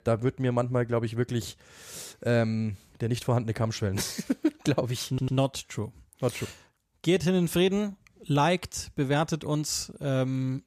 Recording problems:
audio stuttering; at 5 s

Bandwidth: 14.5 kHz